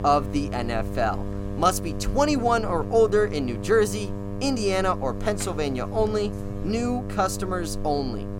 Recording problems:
electrical hum; noticeable; throughout; 50 Hz, 15 dB below the speech

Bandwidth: 16.5 kHz